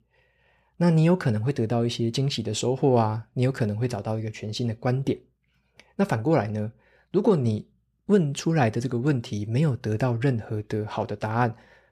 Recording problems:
none

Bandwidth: 14.5 kHz